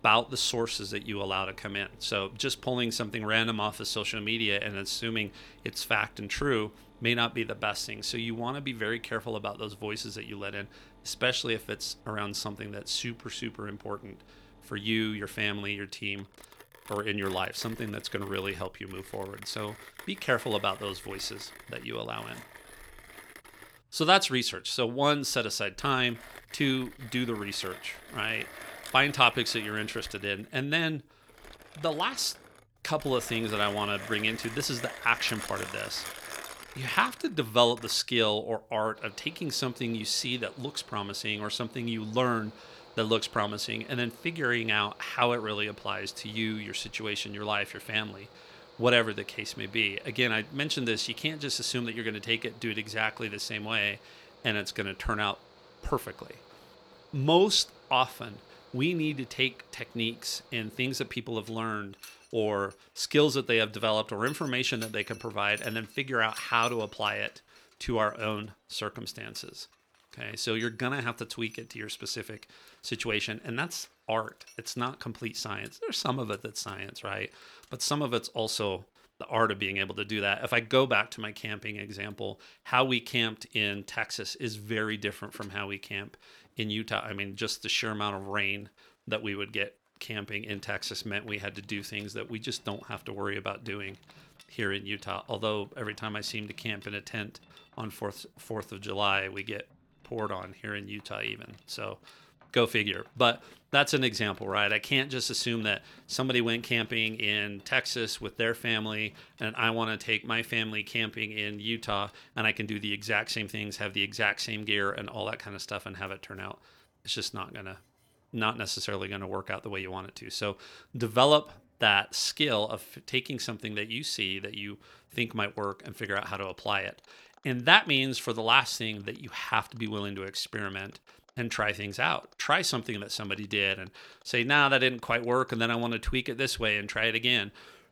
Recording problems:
machinery noise; faint; throughout; 20 dB below the speech

